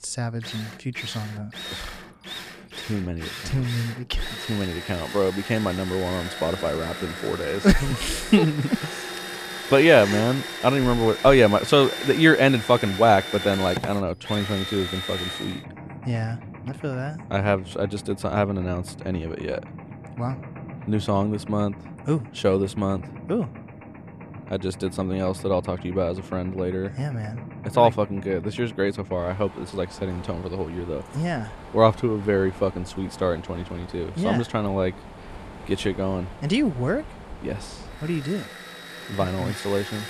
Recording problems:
machinery noise; noticeable; throughout; 10 dB below the speech

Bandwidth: 14.5 kHz